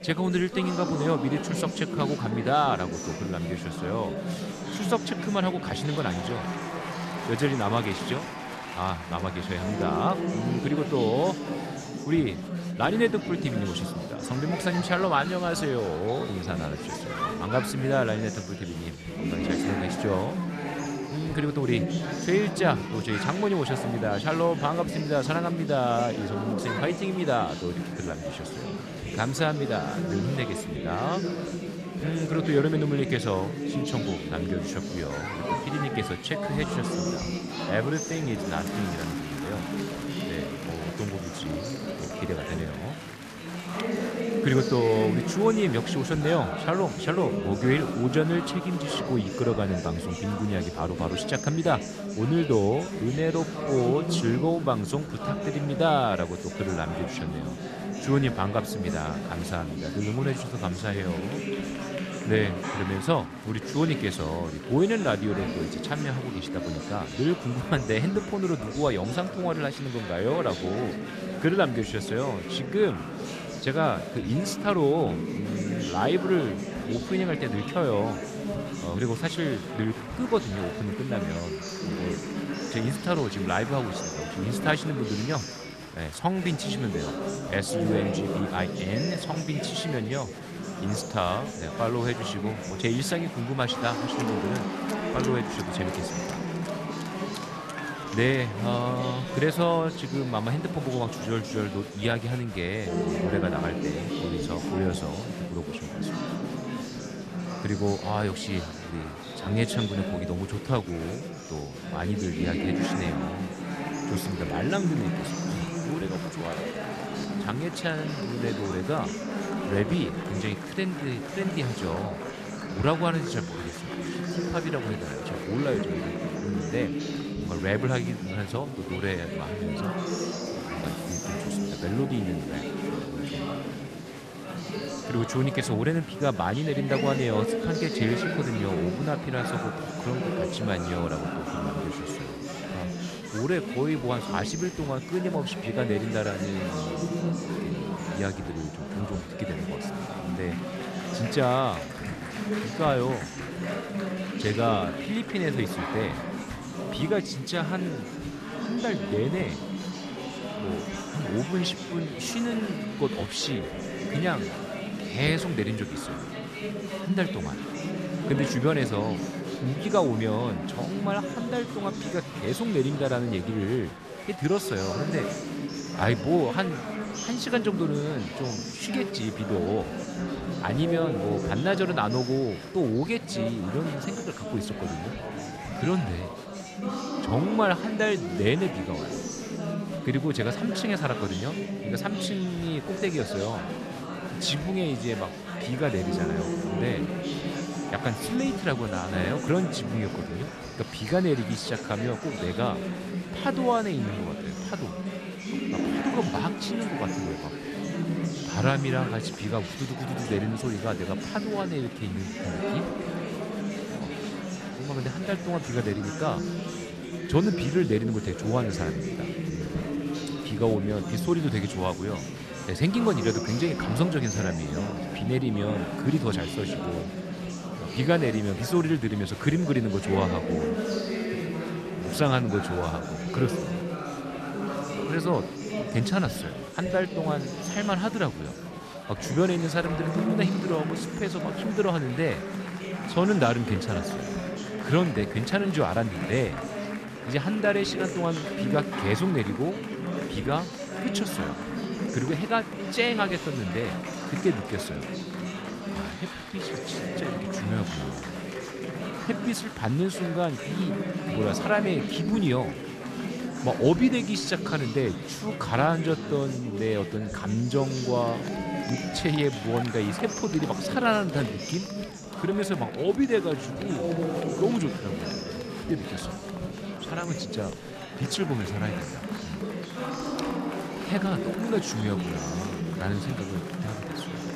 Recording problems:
chatter from many people; loud; throughout; 4 dB below the speech

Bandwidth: 14 kHz